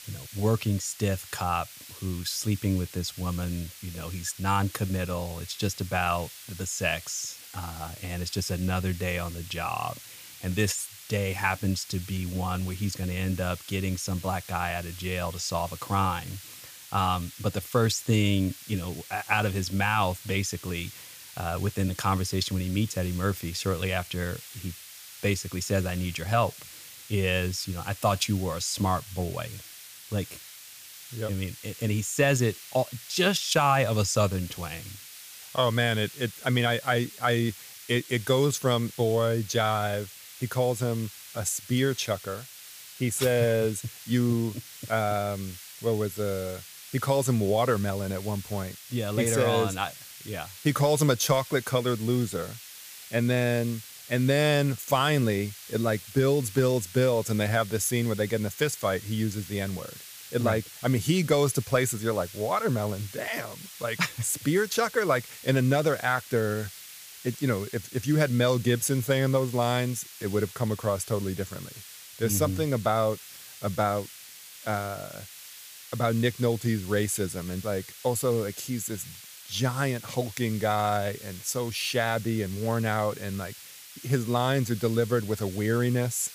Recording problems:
hiss; noticeable; throughout; 15 dB below the speech

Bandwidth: 15 kHz